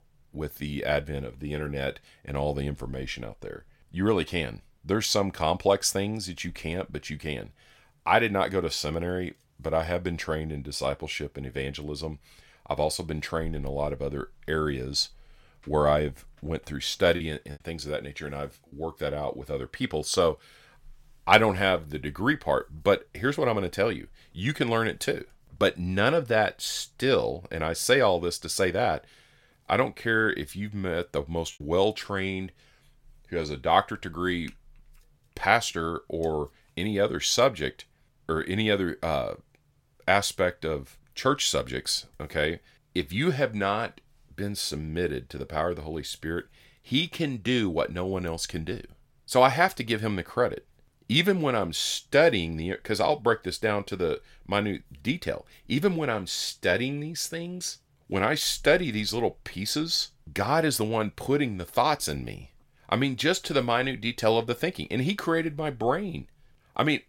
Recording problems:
choppy; very; from 17 to 19 s and at 32 s; 5% of the speech affected

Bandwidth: 16.5 kHz